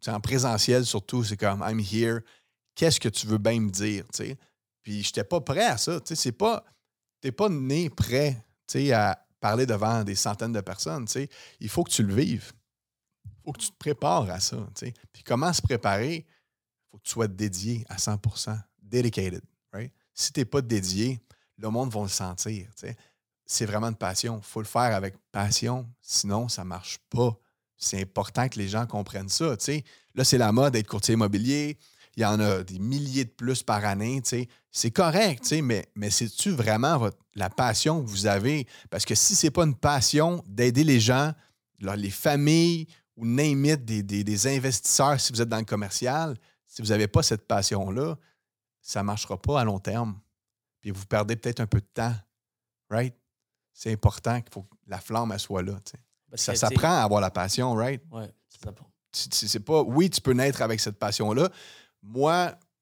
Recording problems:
none

